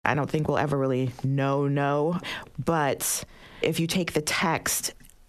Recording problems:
squashed, flat; heavily

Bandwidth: 13.5 kHz